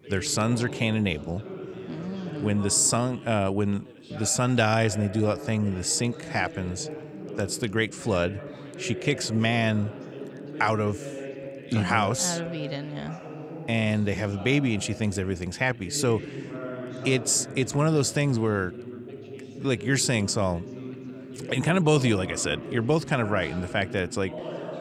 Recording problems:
background chatter; noticeable; throughout; 2 voices, 15 dB below the speech

